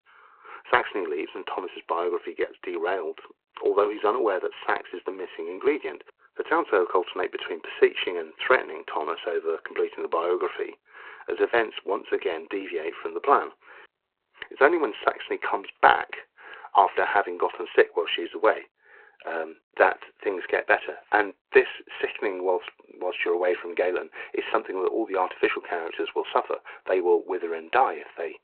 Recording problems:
phone-call audio

